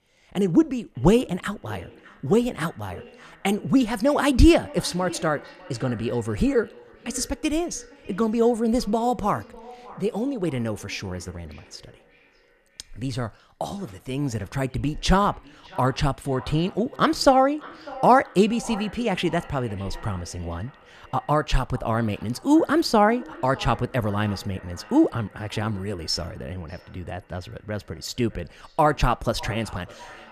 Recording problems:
echo of what is said; faint; throughout; 600 ms later, 20 dB below the speech

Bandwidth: 14.5 kHz